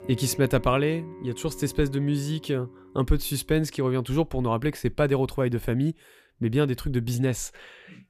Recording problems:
background music; noticeable; throughout; 20 dB below the speech

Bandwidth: 14.5 kHz